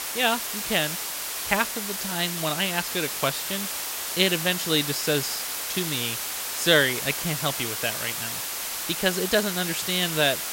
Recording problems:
hiss; loud; throughout; 3 dB below the speech

